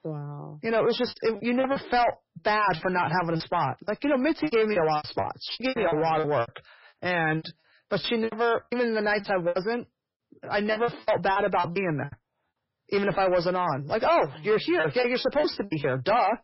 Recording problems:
distortion; heavy; 7 dB below the speech
garbled, watery; badly; nothing above 5.5 kHz
choppy; very; 15% of the speech affected

